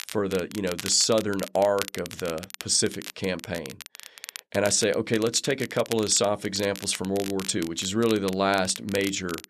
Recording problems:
crackle, like an old record; noticeable; 15 dB below the speech

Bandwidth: 13.5 kHz